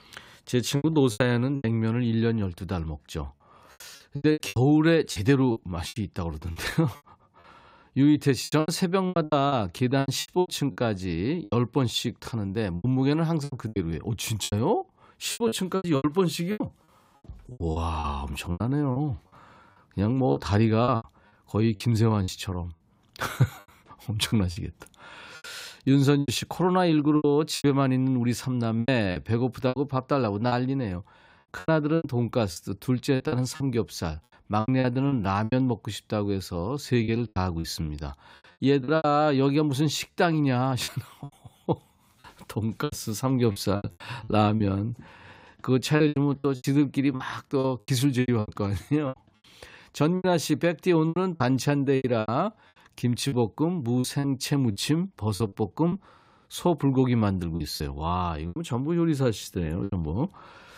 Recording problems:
choppy; very; 13% of the speech affected

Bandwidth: 15.5 kHz